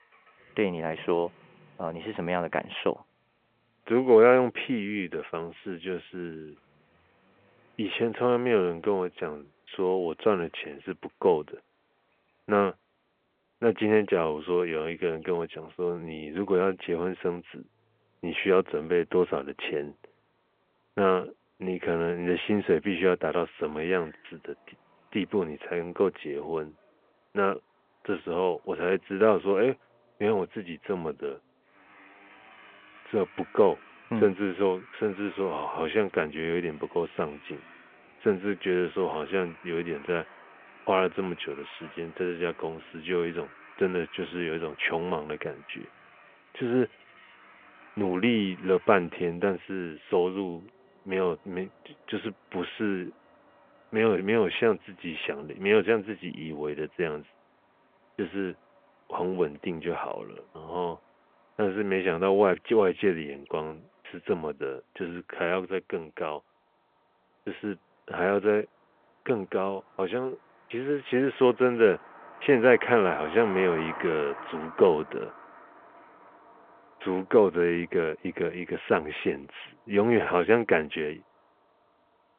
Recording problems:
phone-call audio
traffic noise; faint; throughout; 20 dB below the speech

